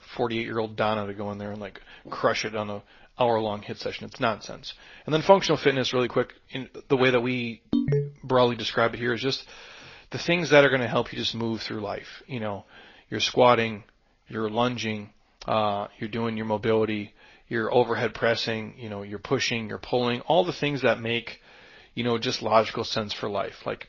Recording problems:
garbled, watery; slightly; nothing above 6 kHz
phone ringing; loud; at 7.5 s; peak 1 dB above the speech

